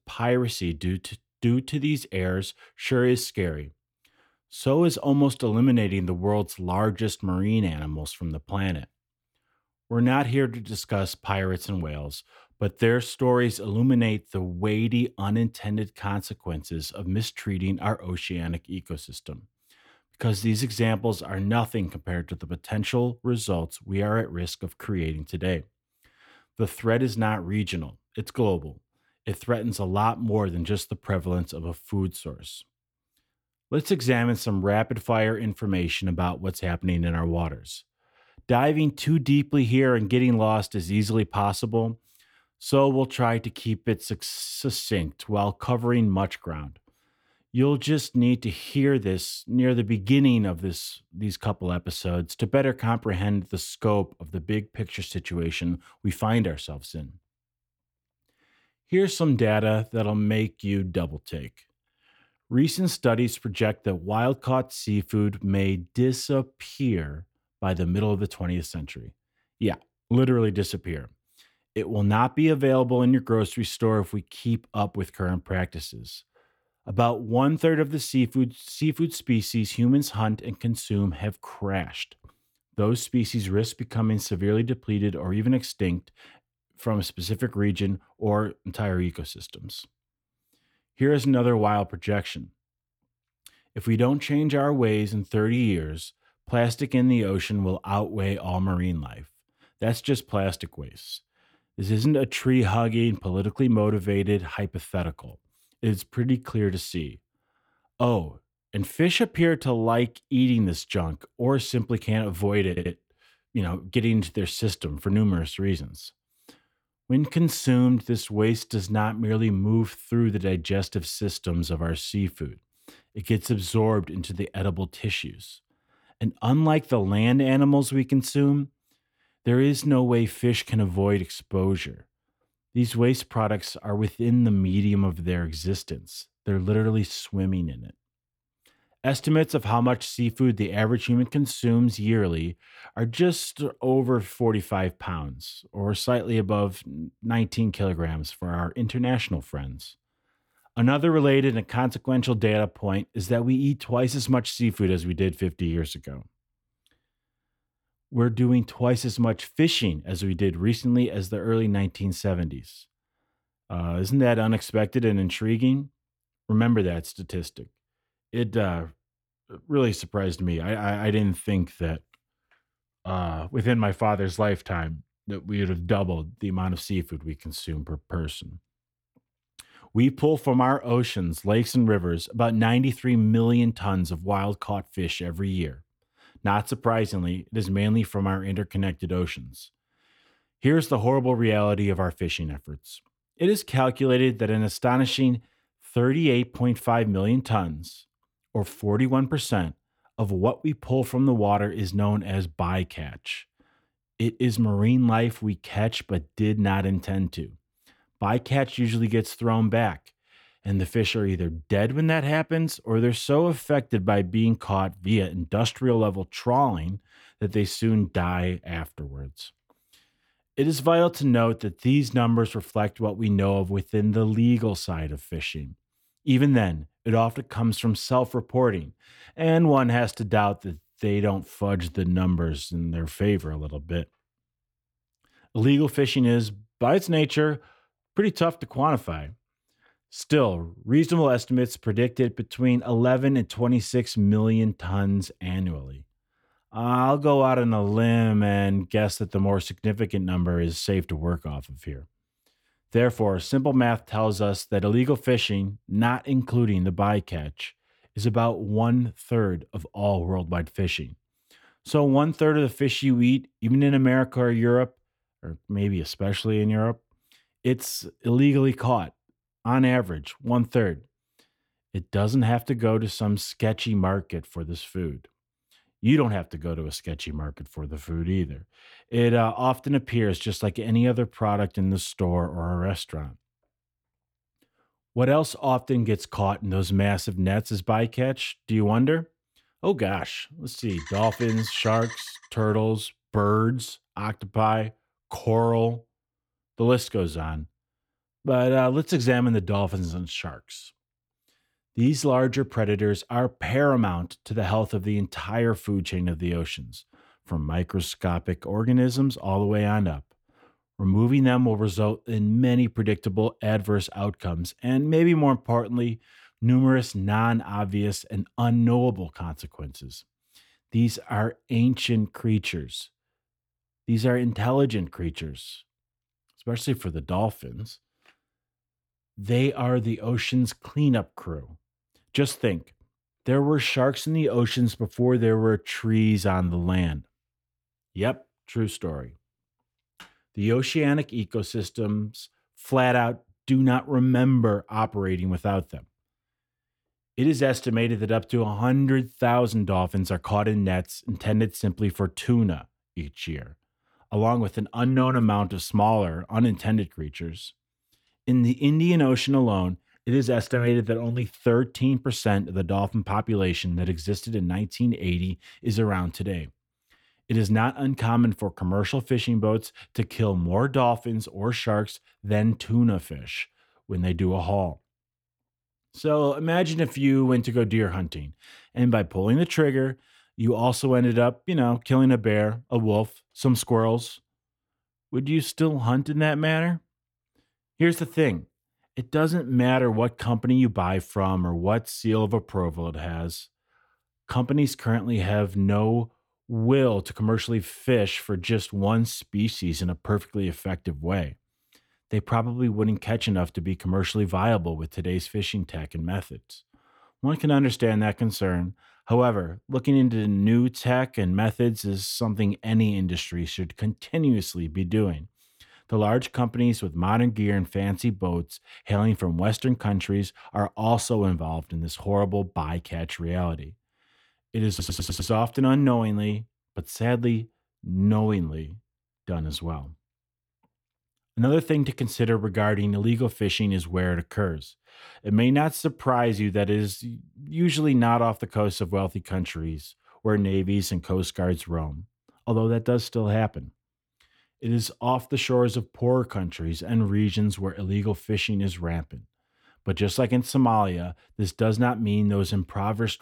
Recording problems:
audio stuttering; at 1:53 and at 7:05

